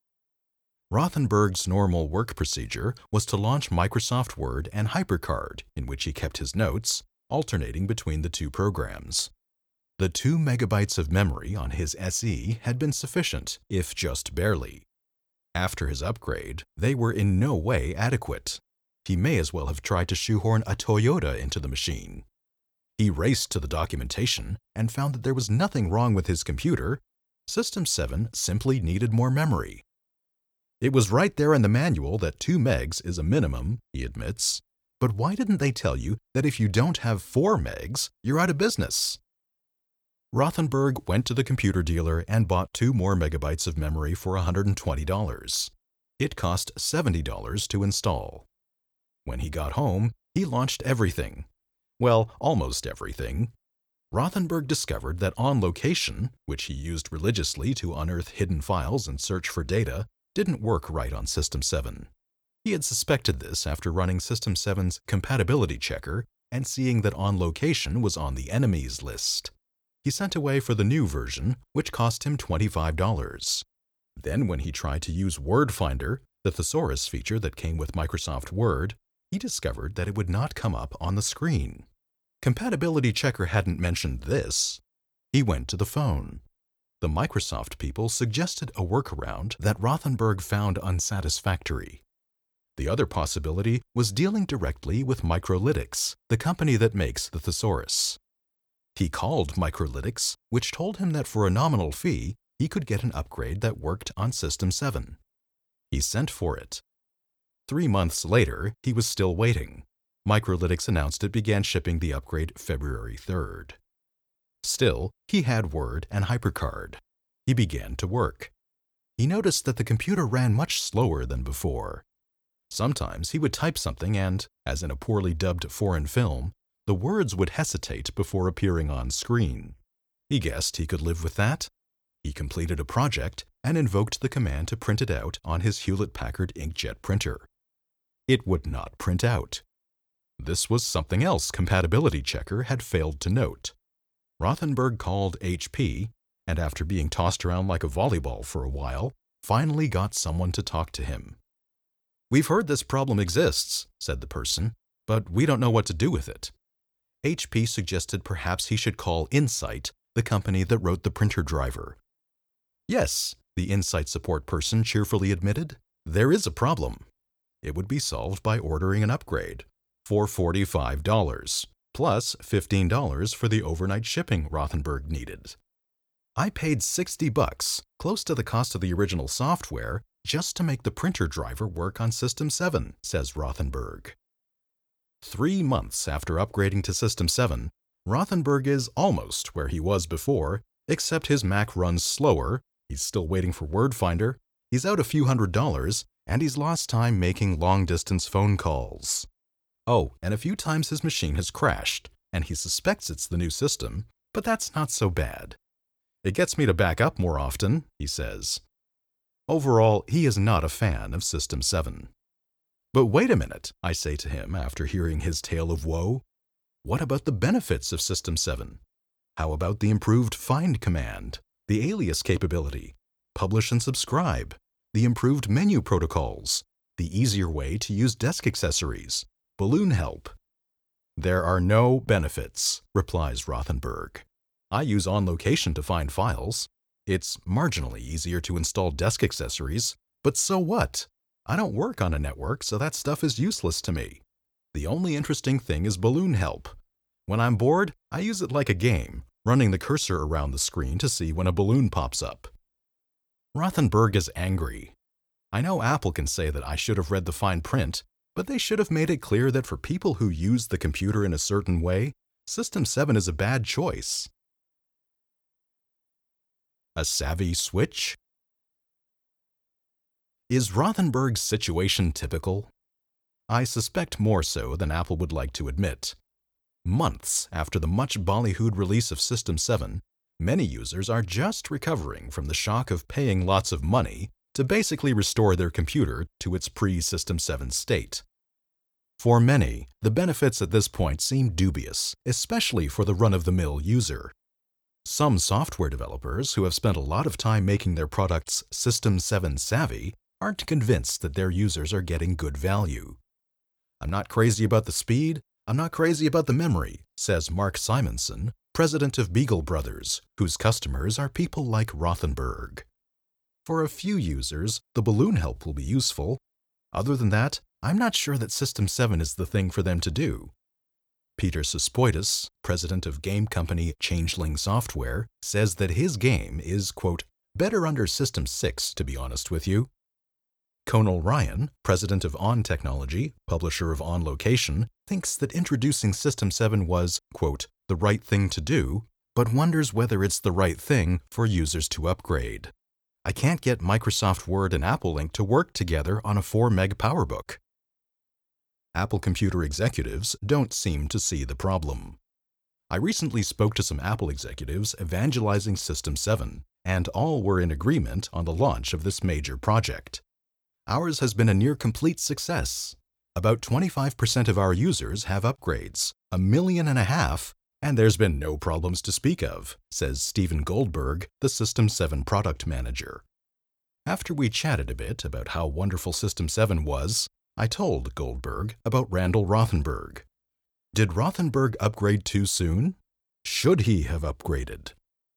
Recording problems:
none

